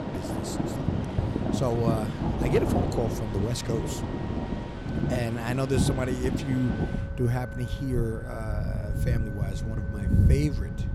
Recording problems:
rain or running water; very loud; throughout; 2 dB above the speech
background music; noticeable; throughout; 15 dB below the speech

